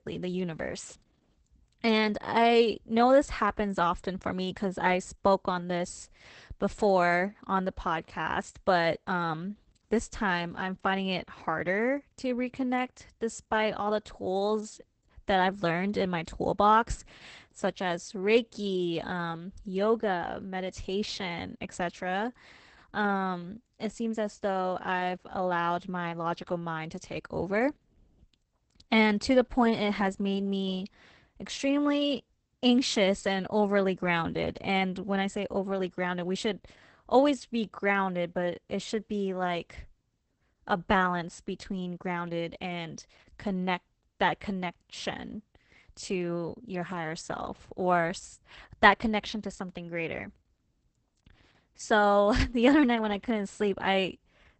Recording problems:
garbled, watery; badly; nothing above 8 kHz

